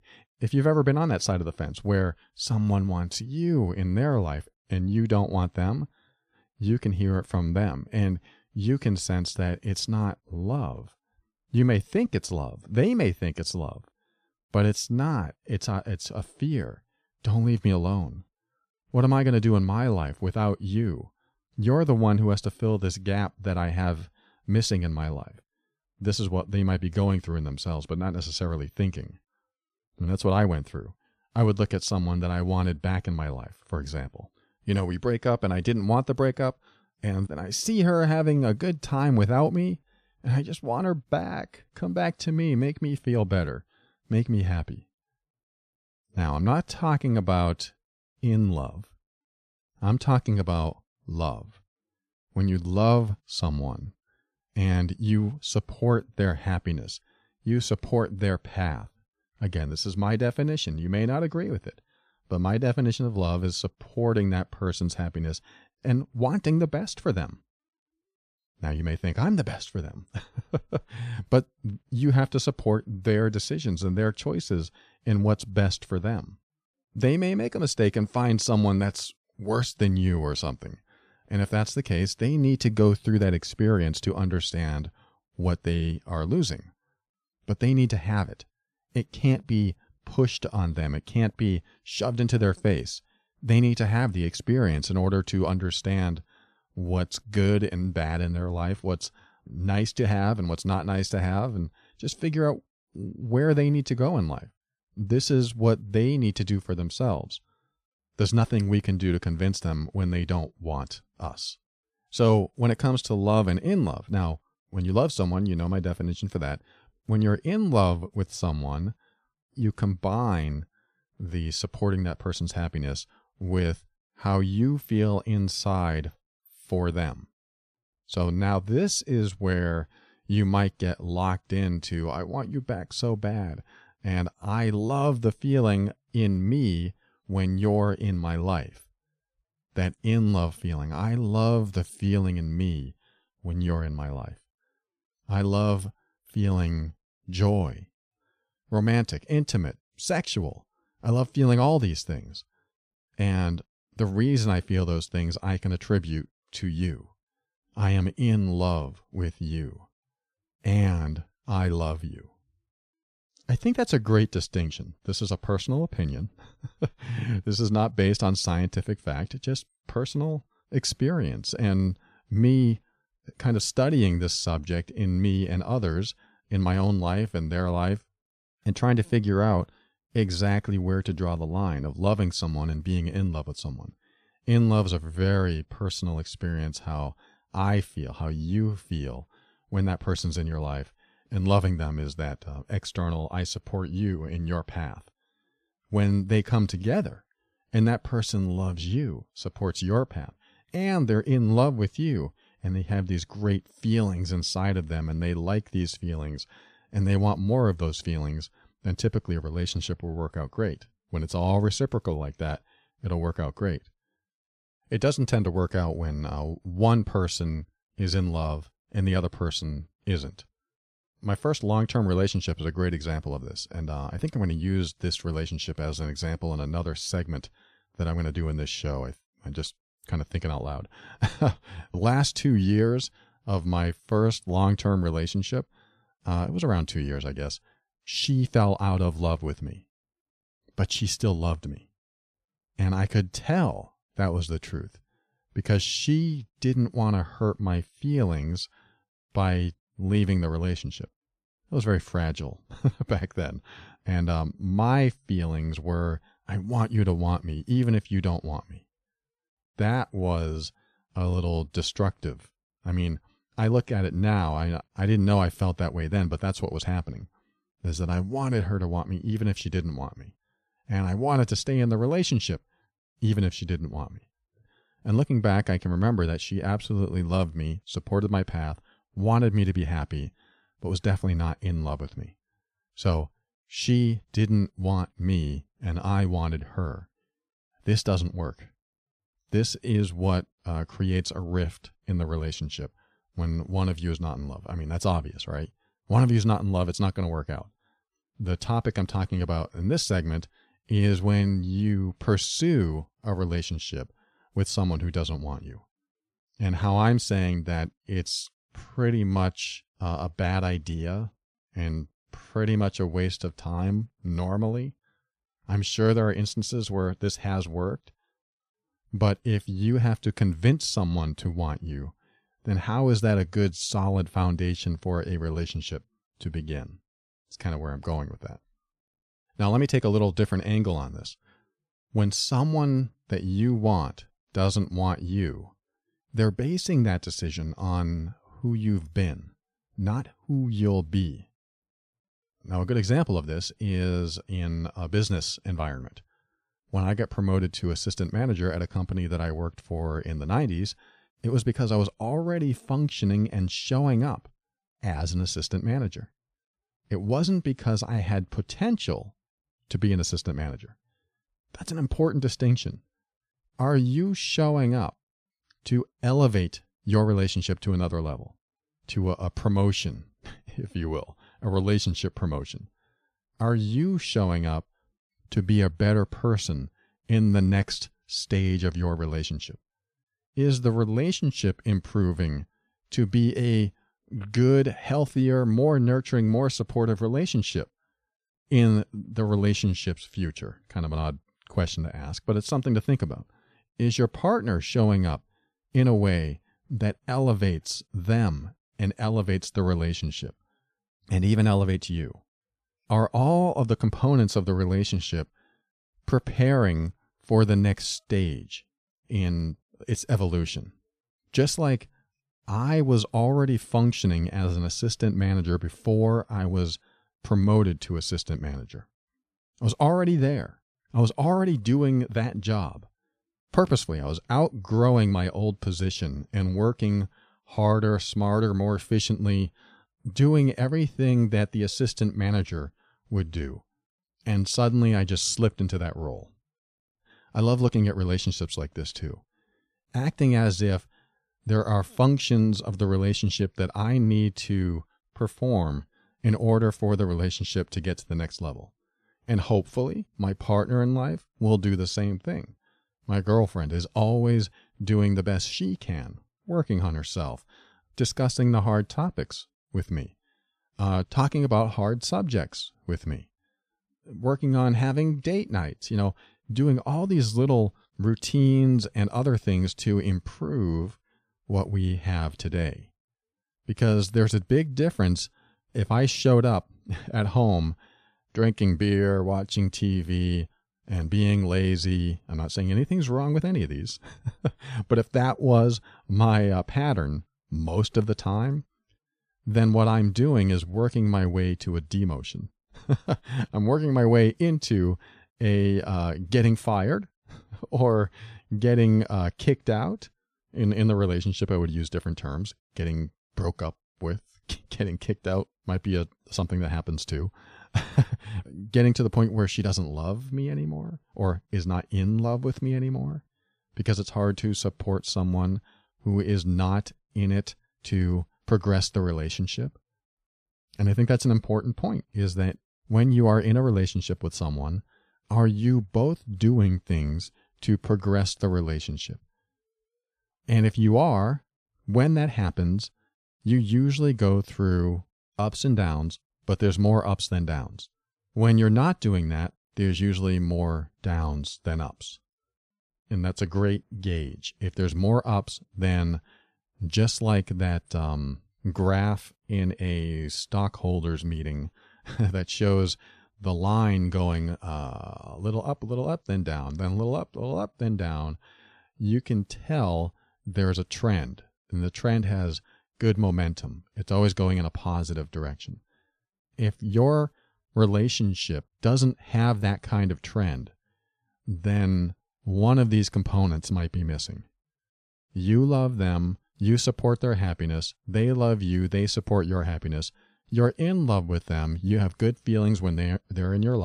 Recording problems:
abrupt cut into speech; at the end

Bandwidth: 14 kHz